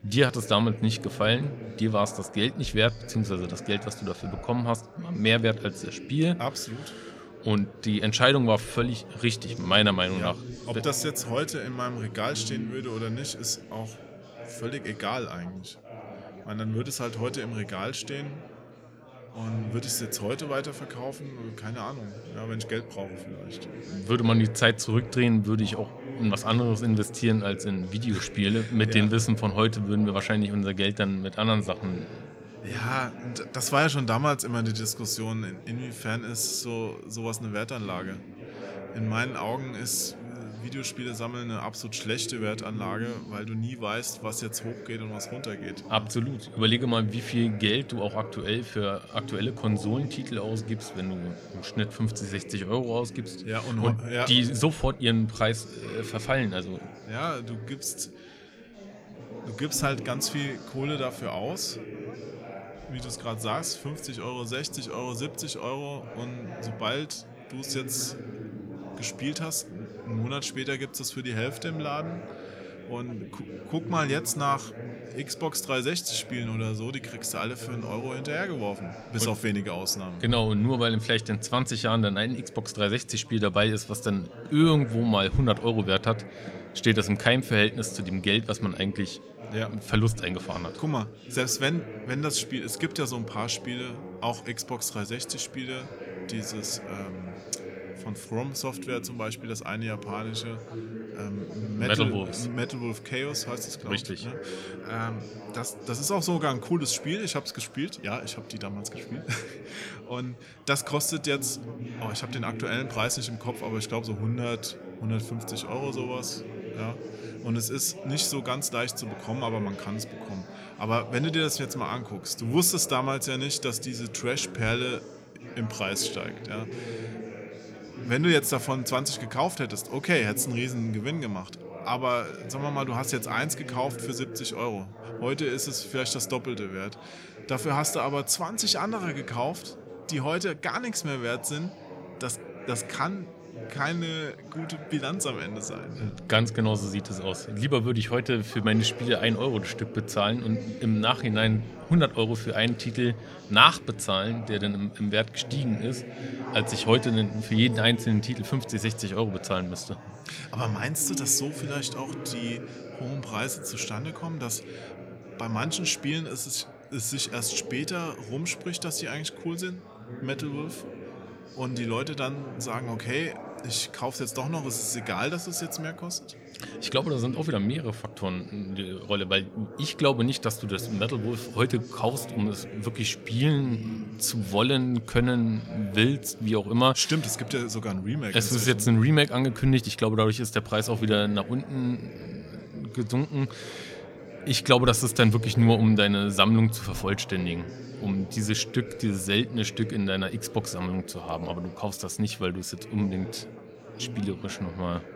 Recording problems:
chatter from many people; noticeable; throughout; 15 dB below the speech

